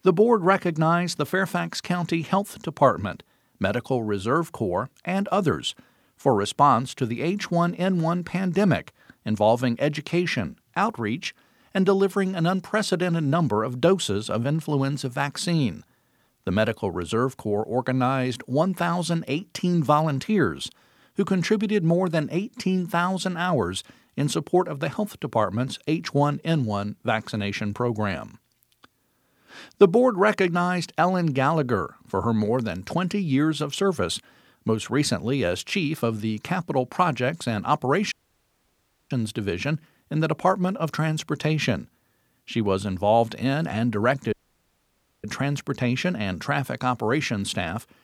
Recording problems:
audio cutting out; at 38 s for 1 s and at 44 s for 1 s

